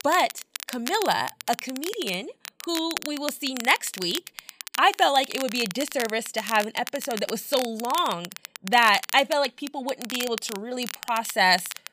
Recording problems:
crackle, like an old record; noticeable; 10 dB below the speech

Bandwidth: 15 kHz